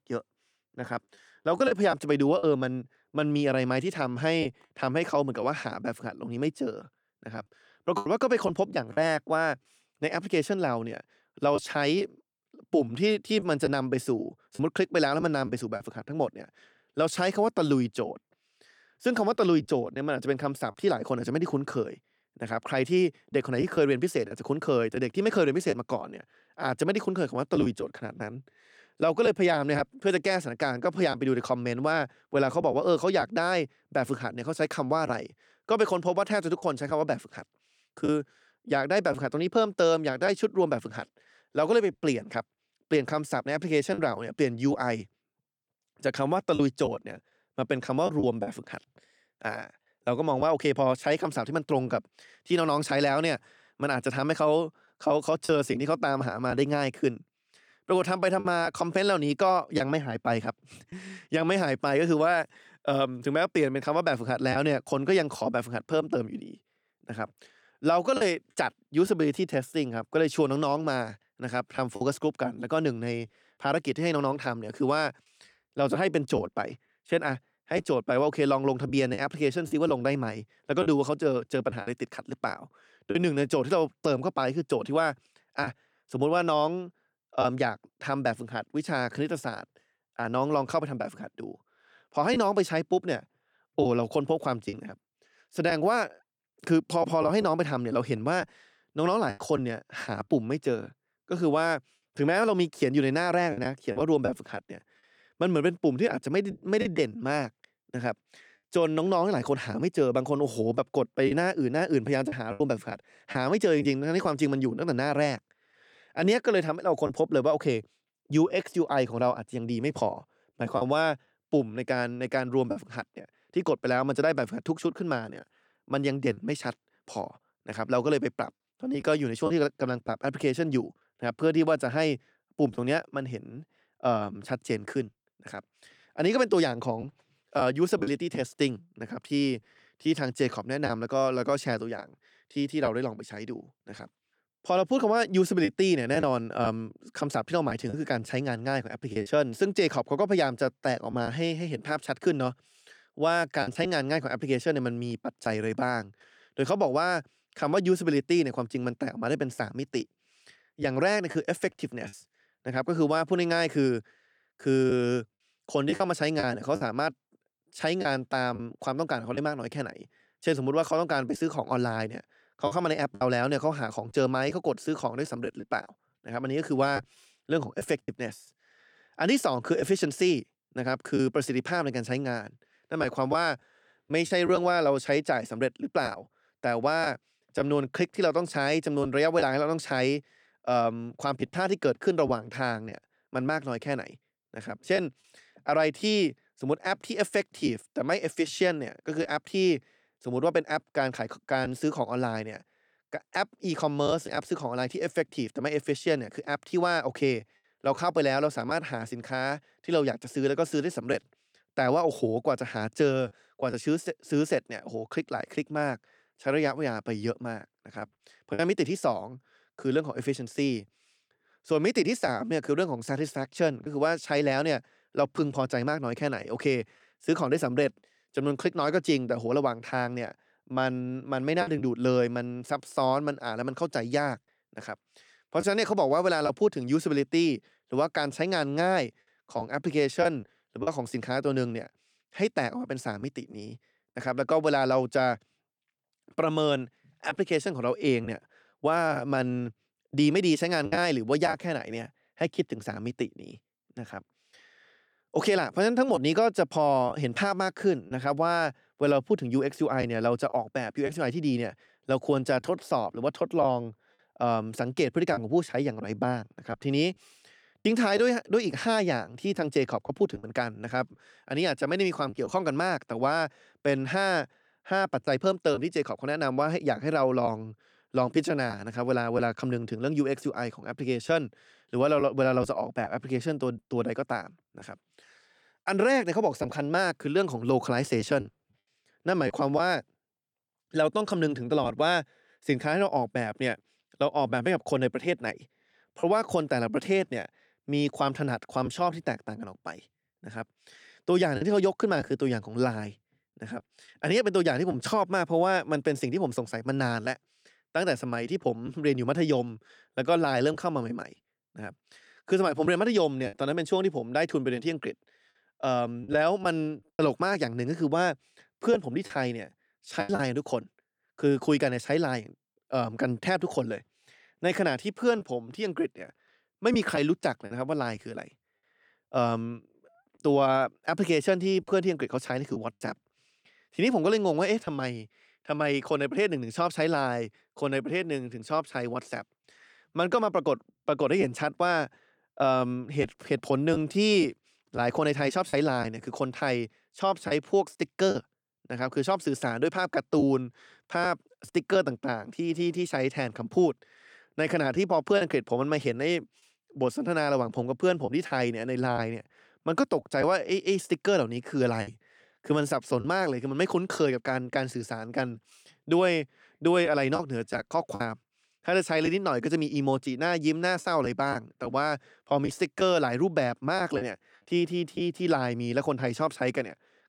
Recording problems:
choppy; occasionally; 2% of the speech affected

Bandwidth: 18.5 kHz